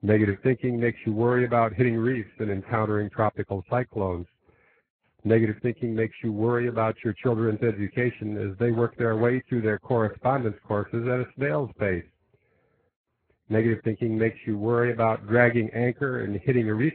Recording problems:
garbled, watery; badly; nothing above 4 kHz

